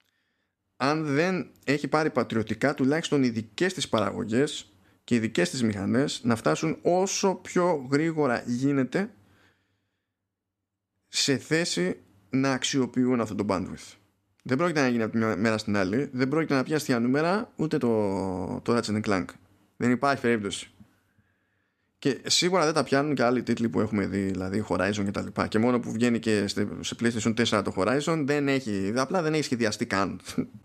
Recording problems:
none

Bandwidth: 14 kHz